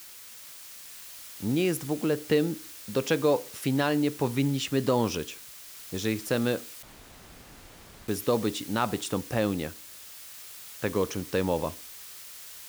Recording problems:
hiss; noticeable; throughout; 15 dB below the speech
audio cutting out; at 7 s for 1.5 s

